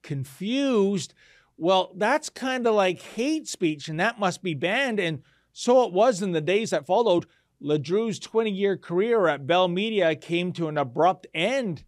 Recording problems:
uneven, jittery; strongly; from 2.5 to 7.5 s

